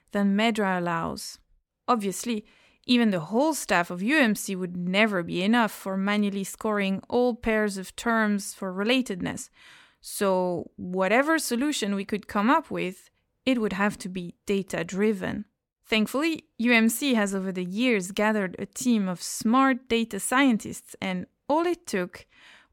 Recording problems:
none

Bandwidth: 17 kHz